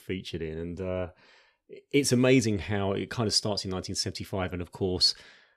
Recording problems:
none

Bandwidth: 15.5 kHz